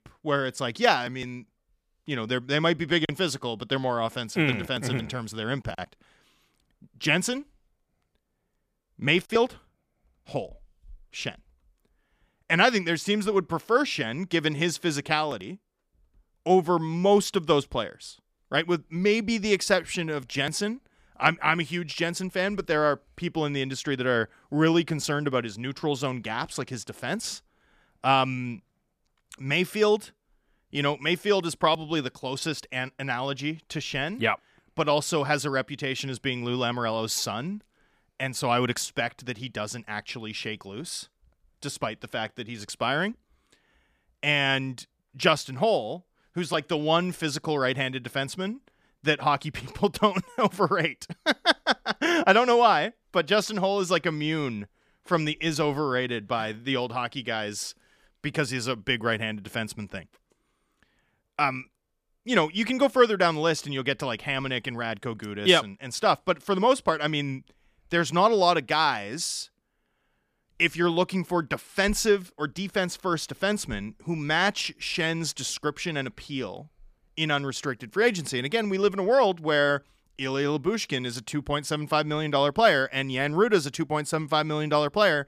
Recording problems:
none

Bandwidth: 14.5 kHz